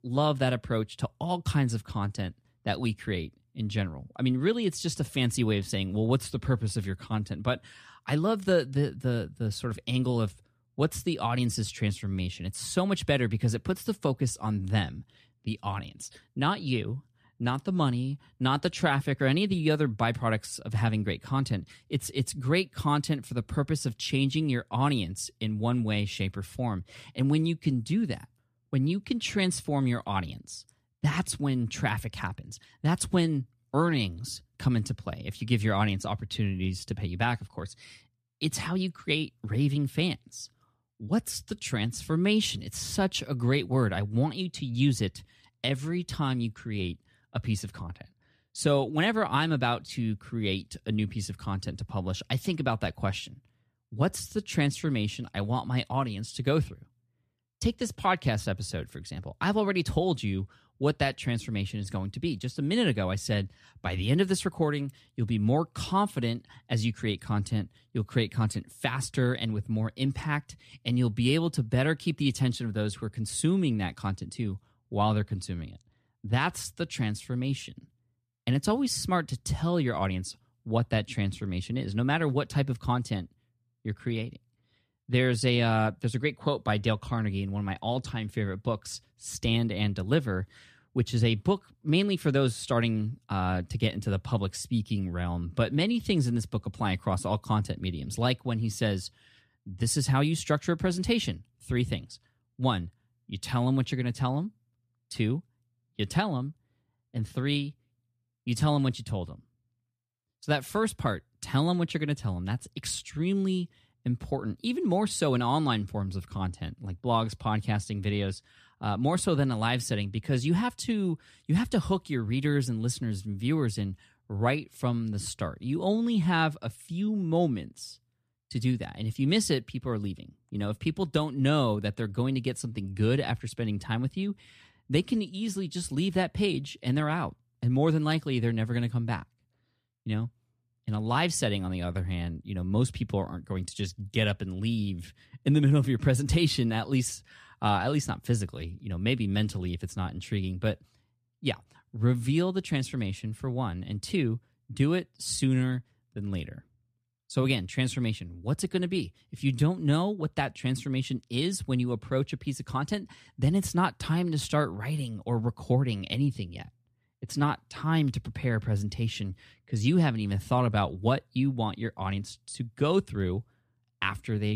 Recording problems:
abrupt cut into speech; at the end

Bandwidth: 14.5 kHz